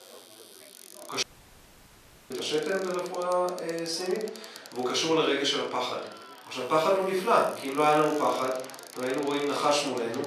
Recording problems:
off-mic speech; far
room echo; noticeable; dies away in 0.5 s
thin; somewhat; fading below 450 Hz
household noises; noticeable; throughout; 20 dB below the speech
chatter from many people; faint; throughout; 20 dB below the speech
audio cutting out; at 1 s for 1 s

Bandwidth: 14.5 kHz